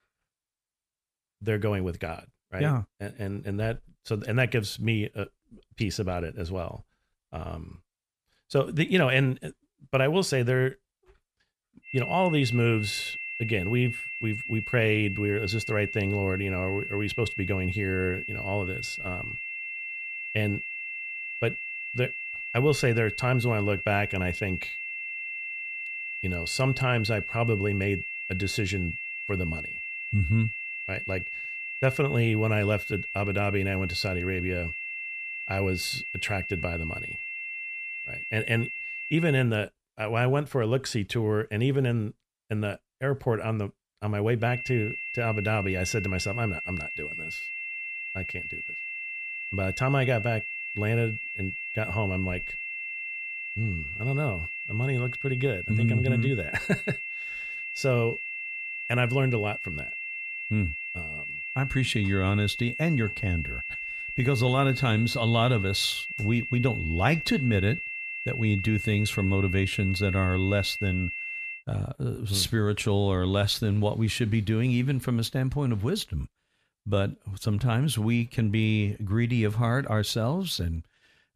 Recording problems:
high-pitched whine; loud; from 12 to 39 s and from 44 s to 1:12; 2.5 kHz, 5 dB below the speech

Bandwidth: 14.5 kHz